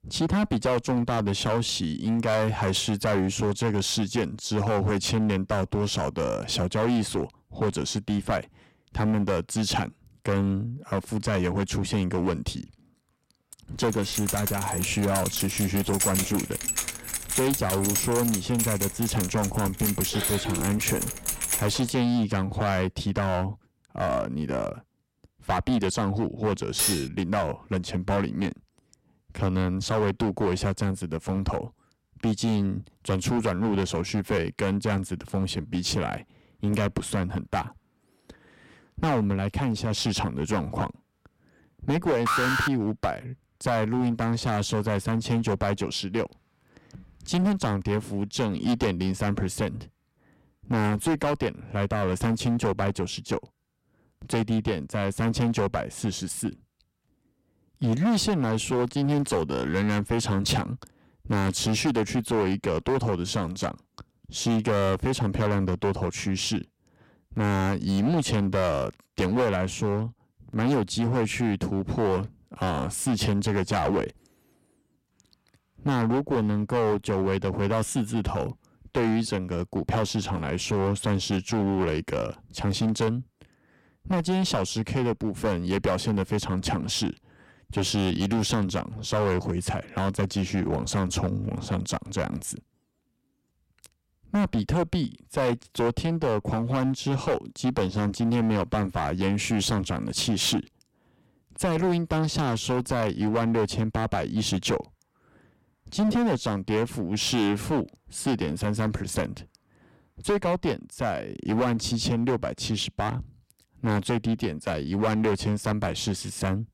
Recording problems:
distortion; heavy; 10% of the sound clipped
jangling keys; loud; from 14 to 22 s; peak 2 dB above the speech
clattering dishes; loud; at 27 s; peak 3 dB above the speech
alarm; loud; at 42 s; peak 3 dB above the speech

